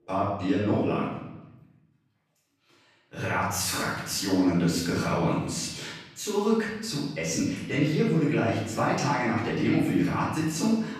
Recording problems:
off-mic speech; far
room echo; noticeable; dies away in 0.9 s

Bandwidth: 14.5 kHz